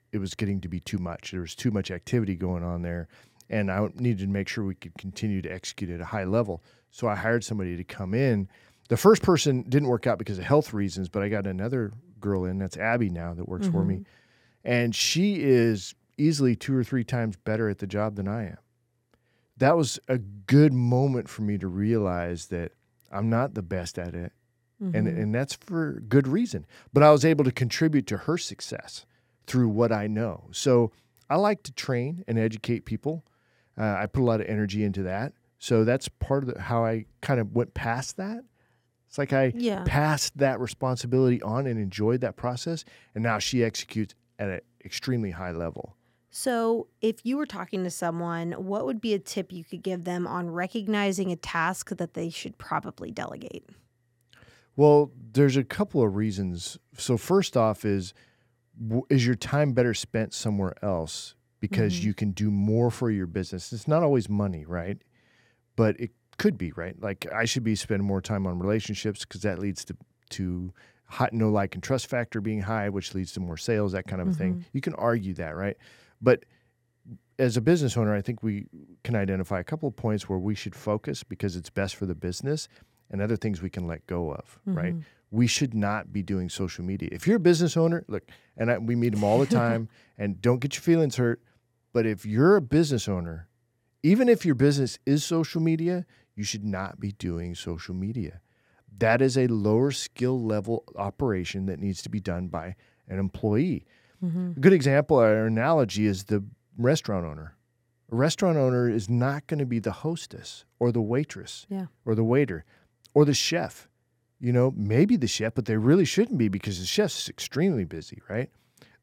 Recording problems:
none

